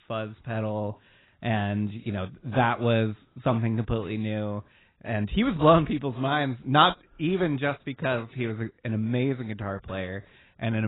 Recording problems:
garbled, watery; badly; nothing above 4 kHz
abrupt cut into speech; at the end

